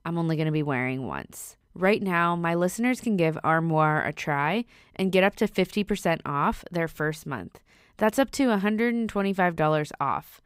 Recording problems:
none

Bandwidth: 15.5 kHz